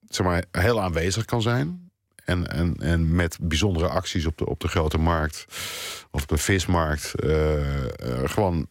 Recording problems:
none

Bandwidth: 16 kHz